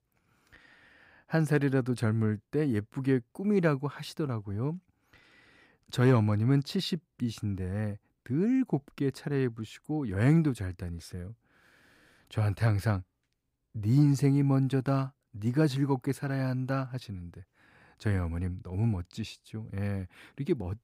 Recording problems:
none

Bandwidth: 15.5 kHz